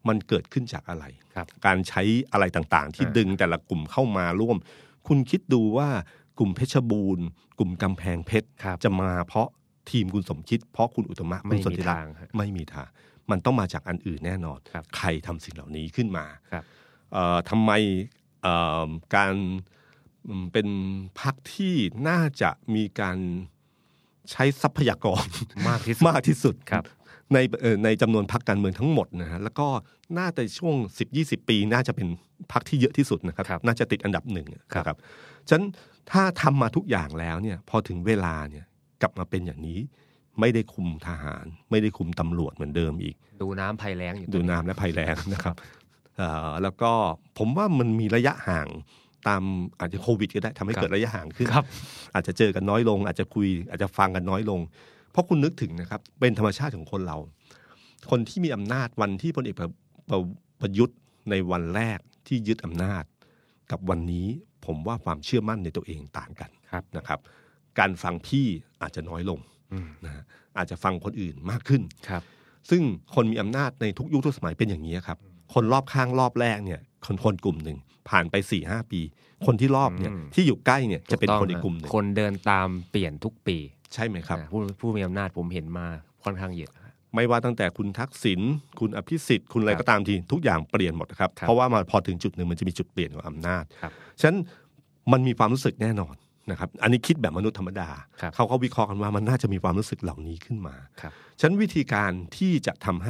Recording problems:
abrupt cut into speech; at the end

